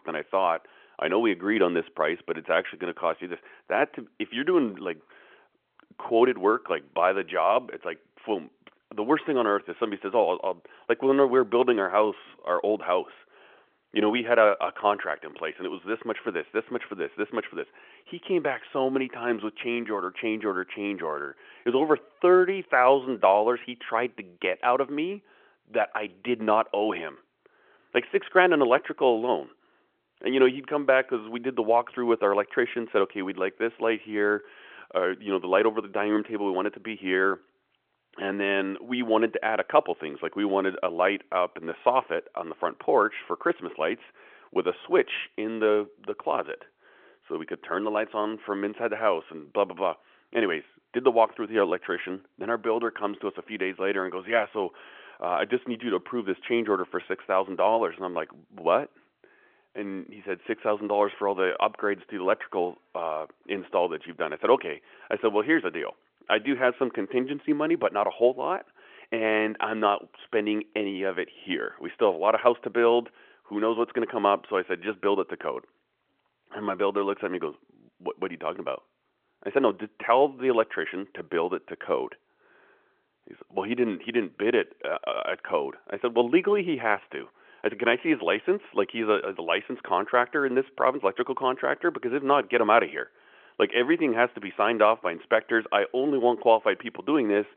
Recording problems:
phone-call audio; nothing above 3.5 kHz

